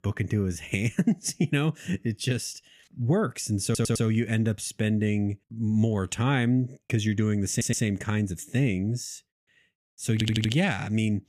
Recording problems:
audio stuttering; at 3.5 s, at 7.5 s and at 10 s

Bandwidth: 14.5 kHz